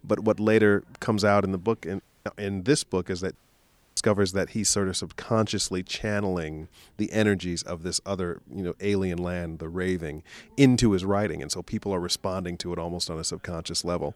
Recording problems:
audio cutting out; at 2 s and at 3.5 s for 0.5 s

